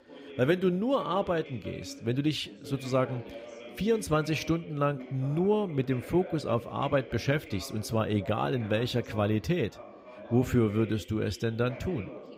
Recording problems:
background chatter; noticeable; throughout; 3 voices, 15 dB below the speech

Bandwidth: 15.5 kHz